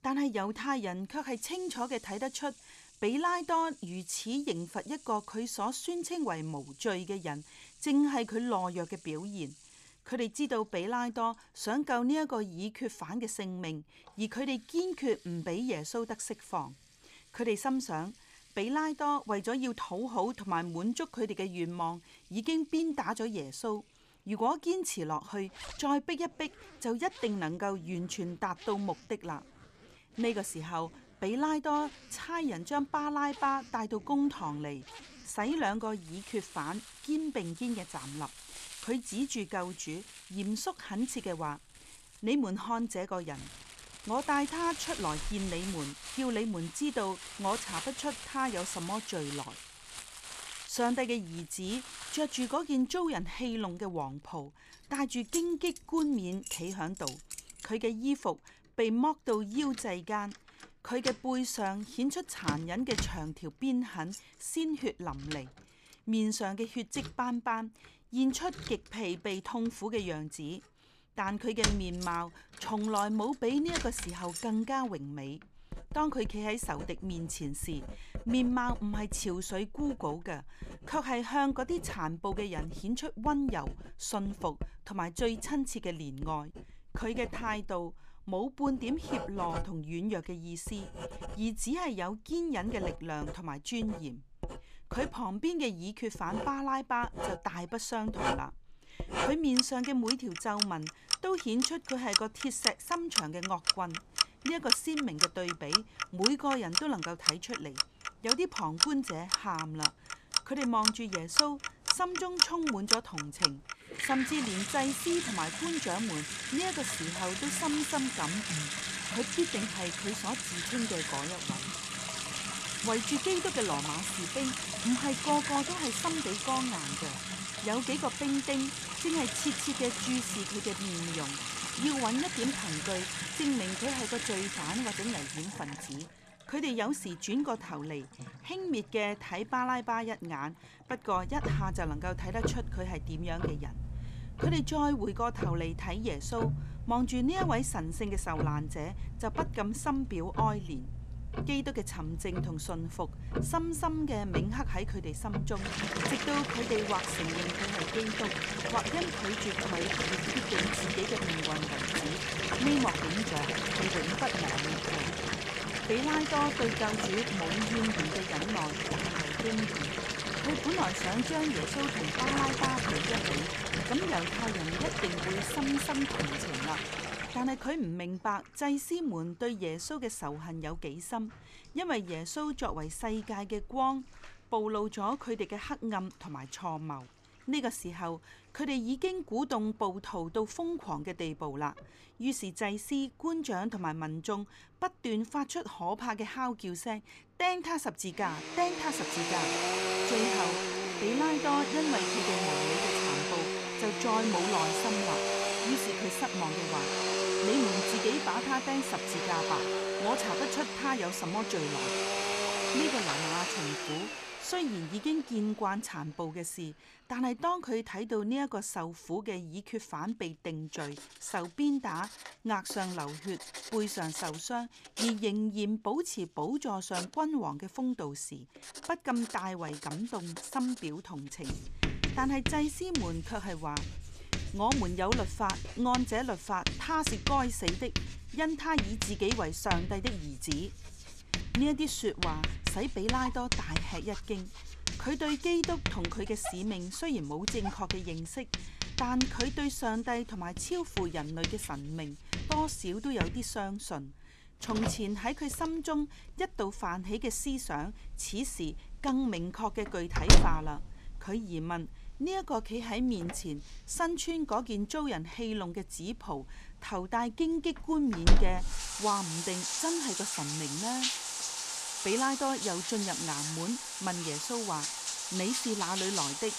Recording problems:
household noises; very loud; throughout; as loud as the speech

